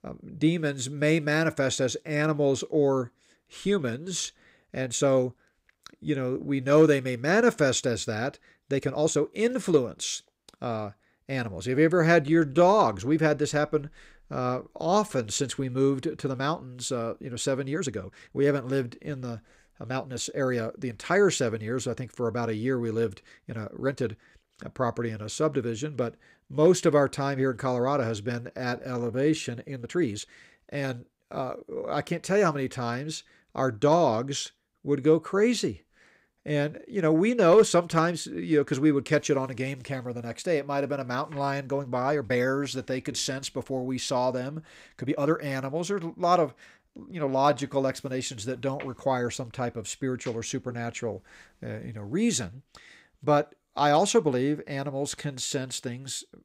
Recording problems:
uneven, jittery; strongly; from 4.5 to 56 s

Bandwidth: 15.5 kHz